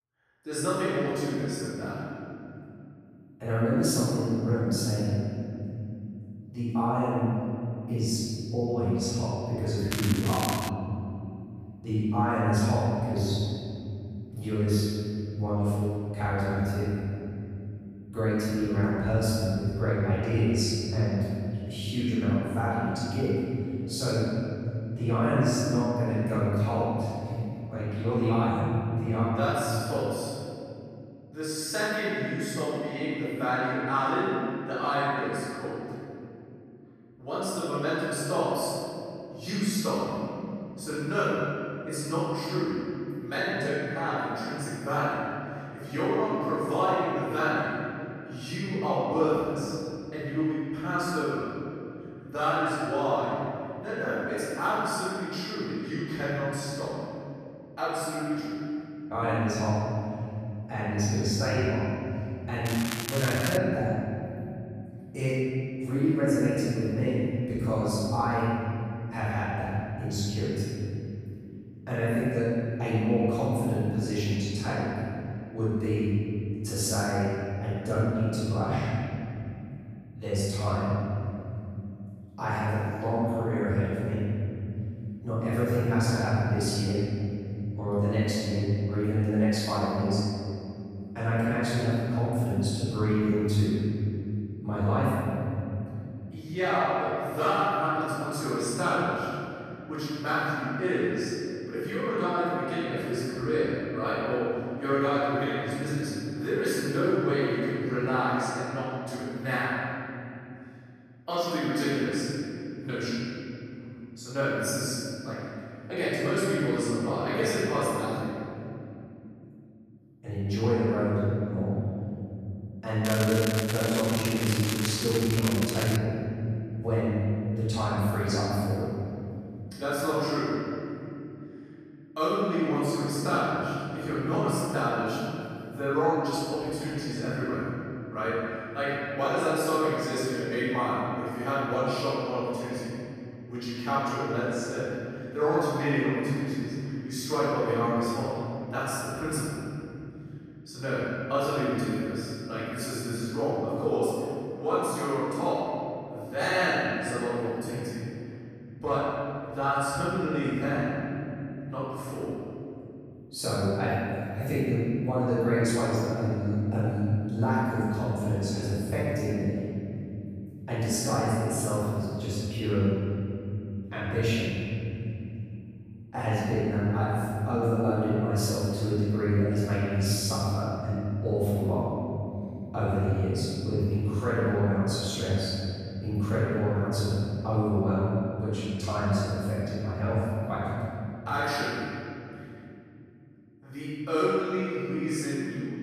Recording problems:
room echo; strong; dies away in 3 s
off-mic speech; far
crackling; loud; at 10 s, at 1:03 and from 2:03 to 2:06; 5 dB below the speech

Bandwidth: 14.5 kHz